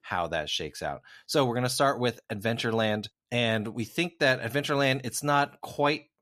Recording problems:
none

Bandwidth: 14.5 kHz